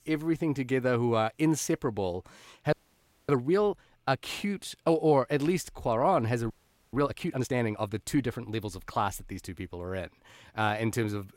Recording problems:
audio freezing; at 2.5 s for 0.5 s and at 6.5 s

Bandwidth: 16 kHz